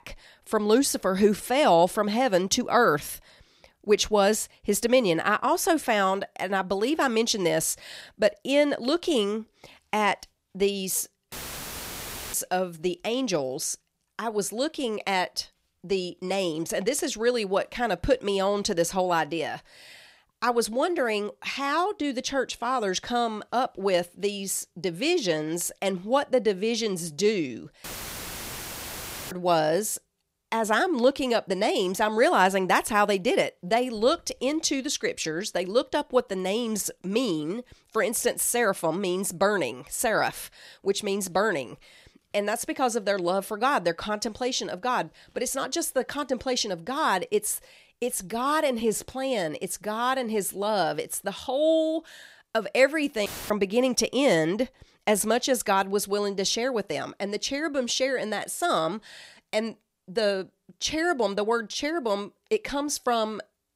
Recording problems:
audio cutting out; filled with static; at 11 s for 1 s, at 28 s for 1.5 s and at 53 s

